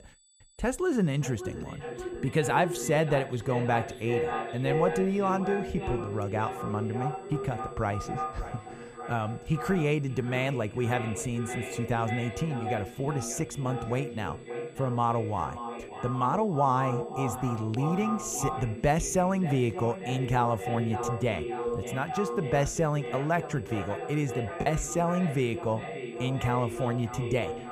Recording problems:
echo of what is said; strong; throughout; 580 ms later, 7 dB below the speech
high-pitched whine; faint; throughout; 8 kHz, 30 dB below the speech
choppy; occasionally; at 25 s; 5% of the speech affected

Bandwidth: 14.5 kHz